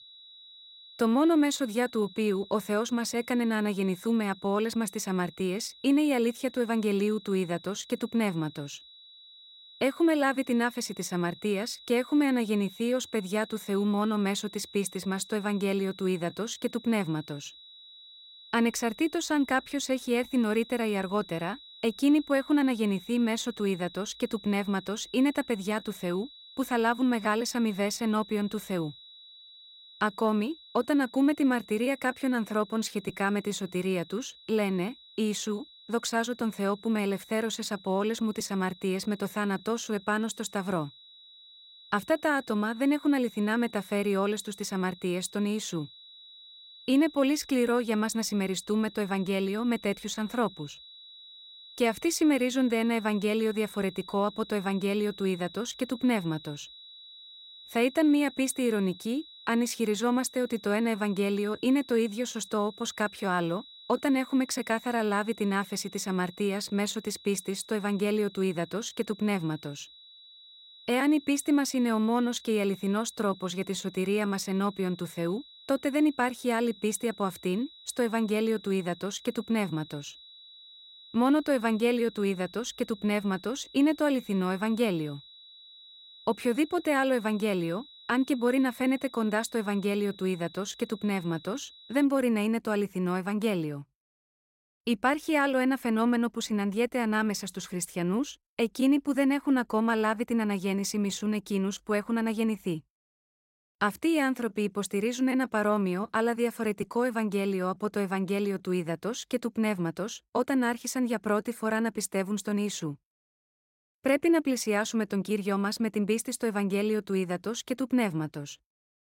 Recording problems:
high-pitched whine; noticeable; until 1:32; 4 kHz, 20 dB below the speech

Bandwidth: 16 kHz